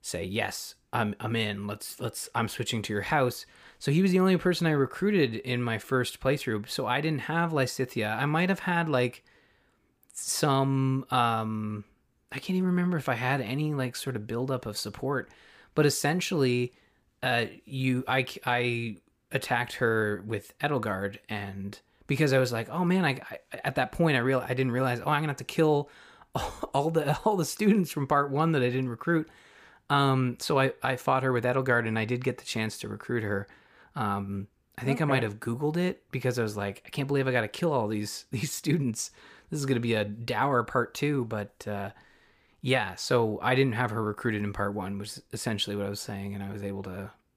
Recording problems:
none

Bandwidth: 15 kHz